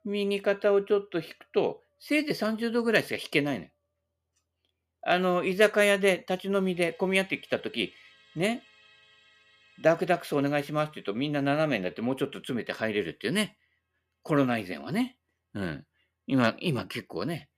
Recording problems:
background music; faint; throughout; 30 dB below the speech

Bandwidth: 14.5 kHz